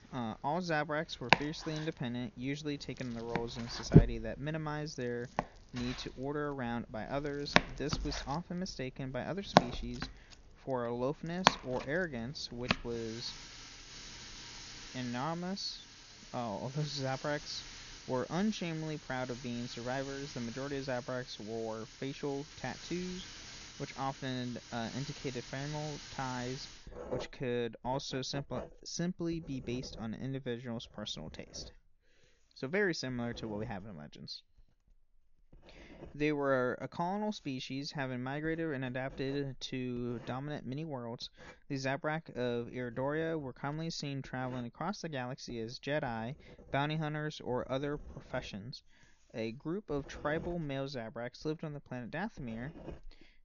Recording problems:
high frequencies cut off; noticeable; nothing above 7 kHz
household noises; very loud; throughout; 1 dB above the speech

